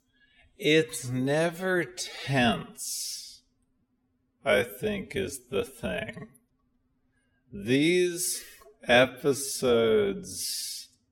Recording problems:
wrong speed, natural pitch; too slow; 0.5 times normal speed

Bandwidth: 17 kHz